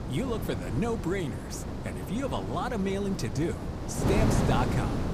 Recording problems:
wind noise on the microphone; heavy; 3 dB below the speech

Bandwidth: 15 kHz